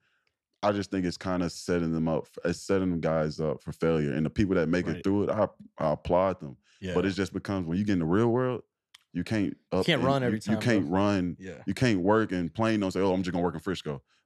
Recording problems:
none

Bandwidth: 13.5 kHz